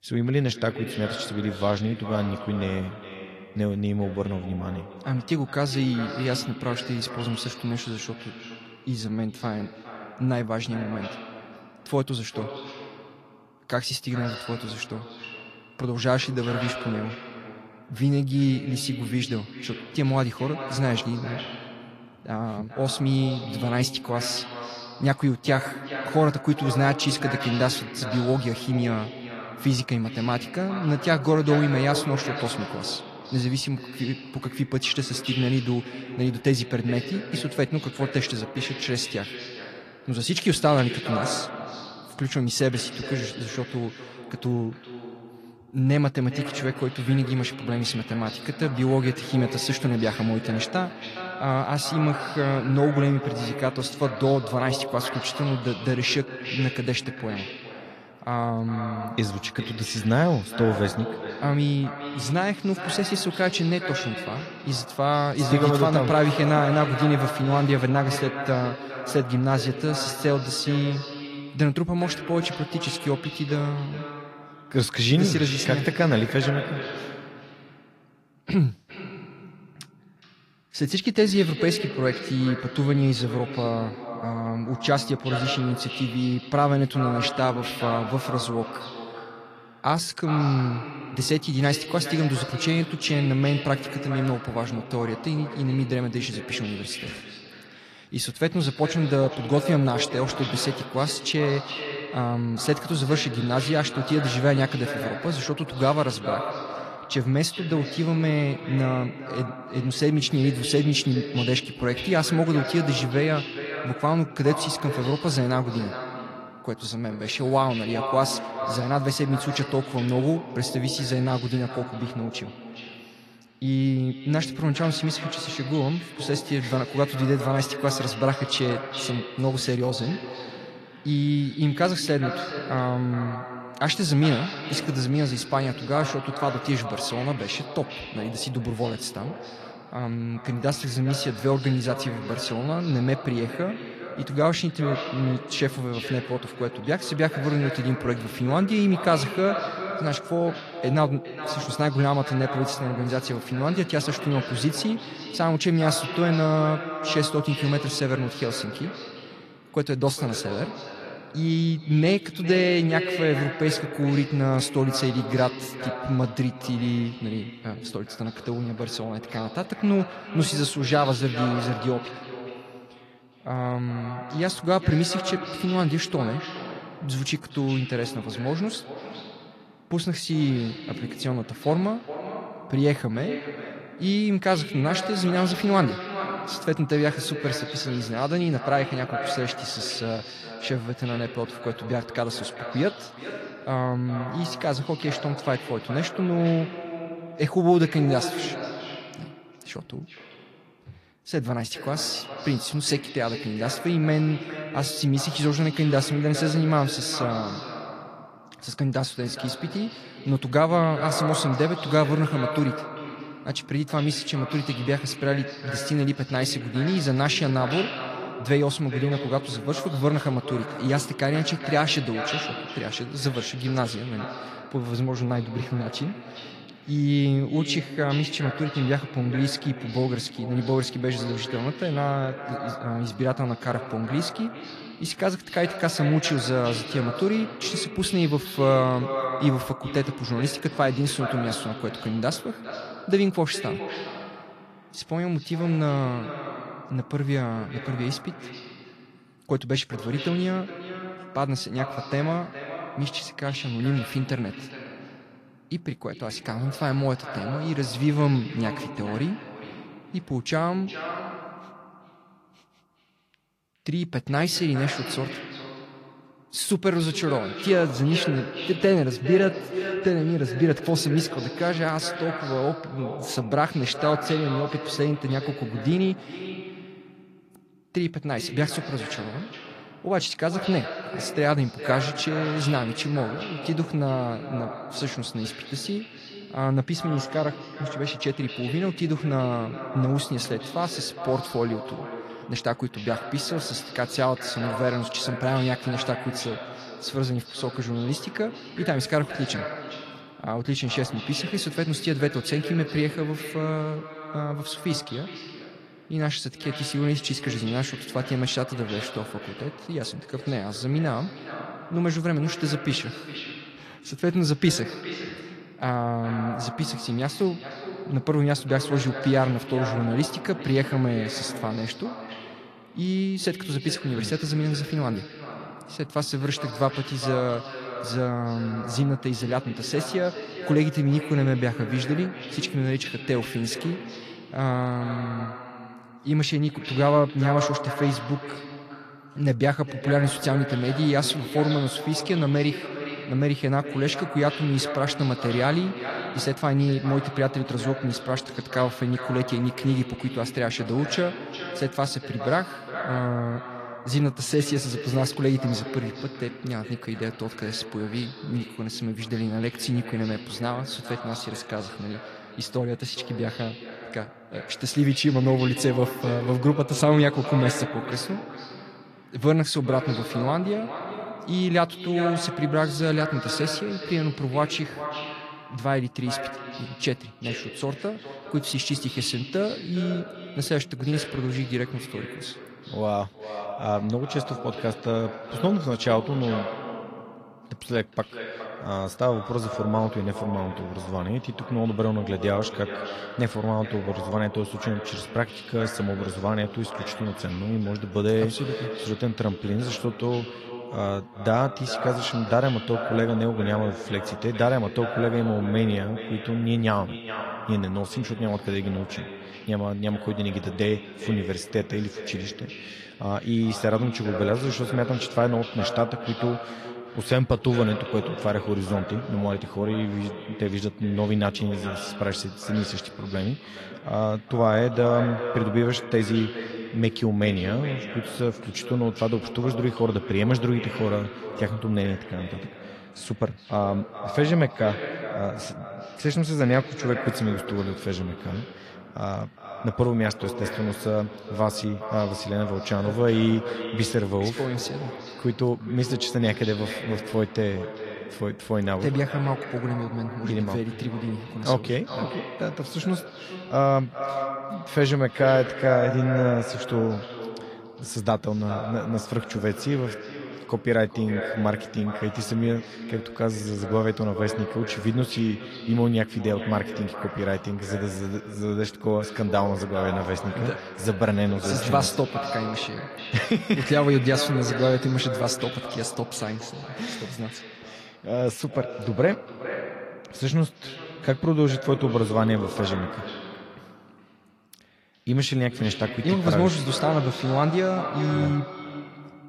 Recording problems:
echo of what is said; strong; throughout; 410 ms later, 9 dB below the speech
garbled, watery; slightly

